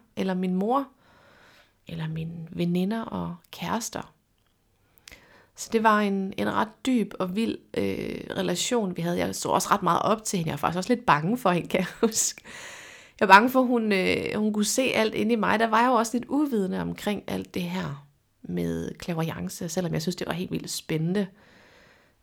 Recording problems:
none

